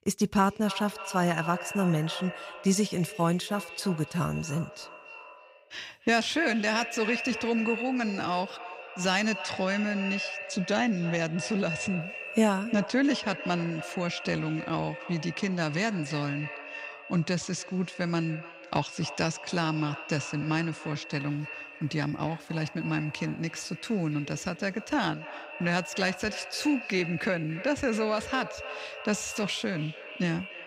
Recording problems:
echo of what is said; strong; throughout; 290 ms later, 9 dB below the speech

